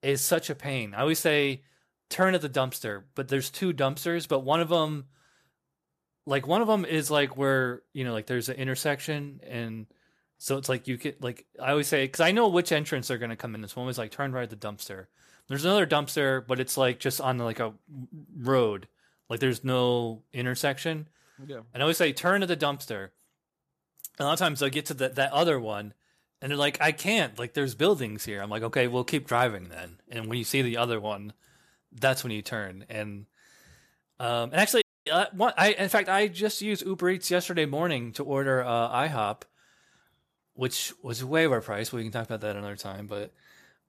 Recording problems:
audio cutting out; at 35 s

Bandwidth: 14.5 kHz